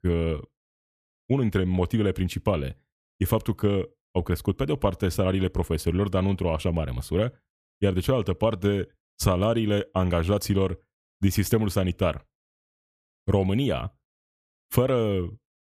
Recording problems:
none

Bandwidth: 14.5 kHz